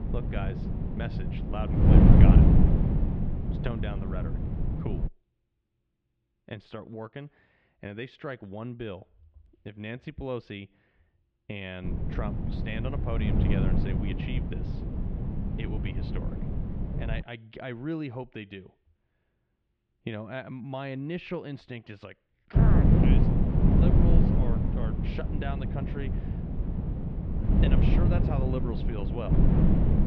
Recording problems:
muffled; slightly; fading above 3.5 kHz
wind noise on the microphone; heavy; until 5 s, from 12 to 17 s and from 23 s on; 4 dB above the speech

